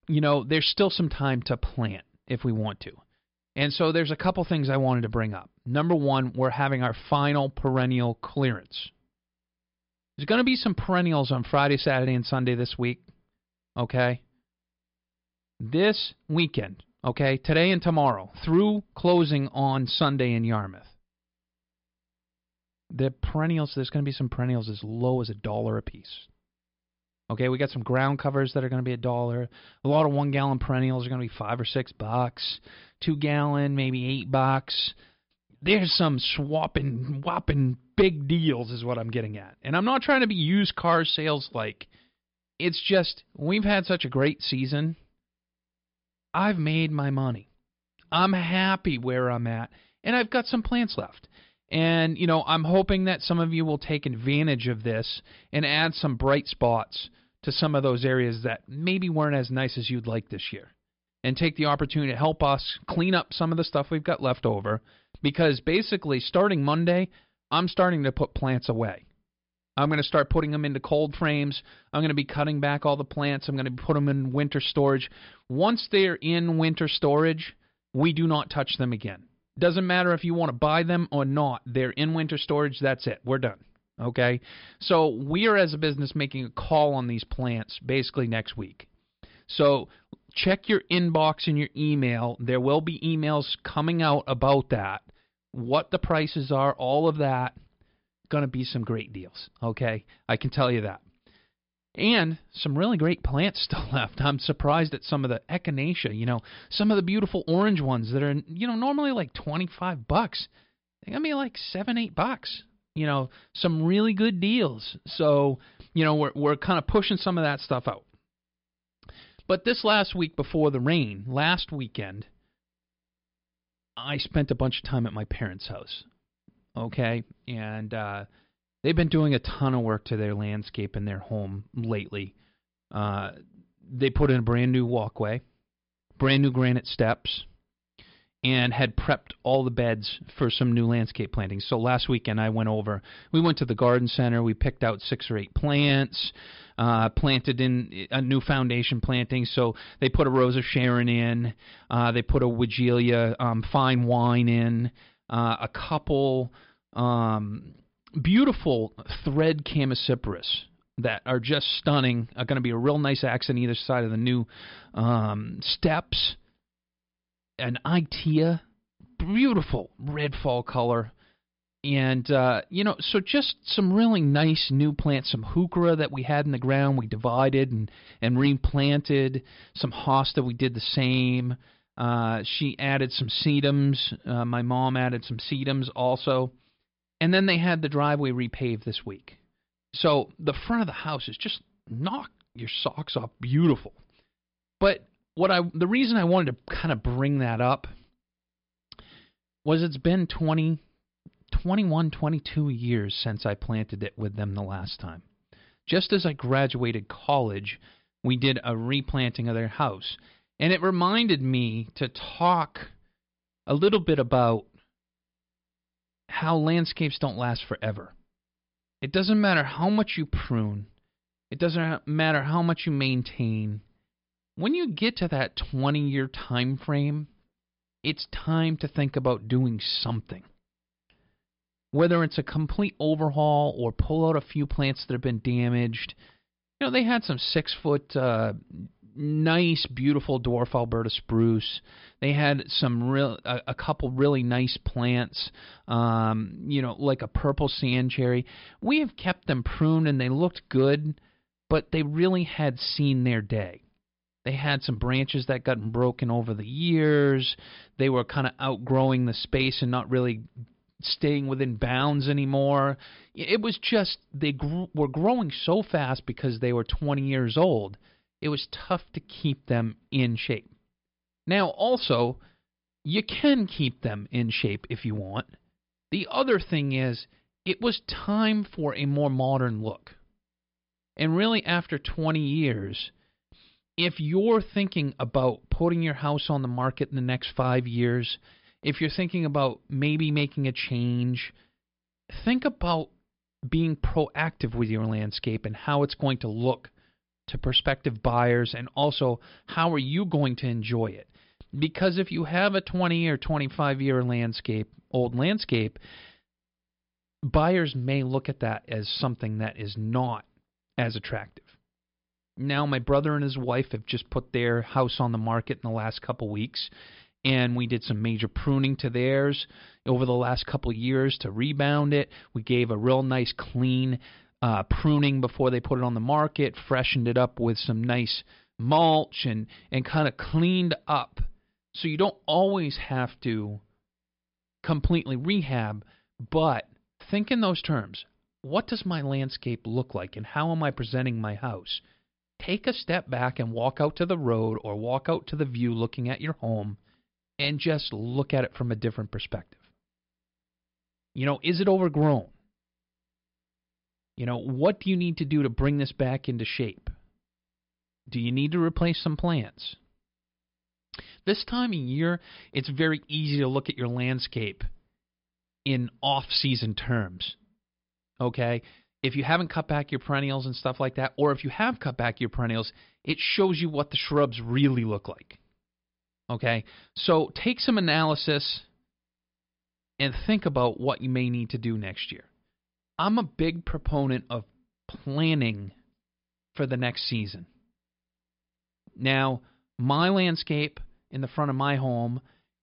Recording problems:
high frequencies cut off; noticeable; nothing above 5.5 kHz

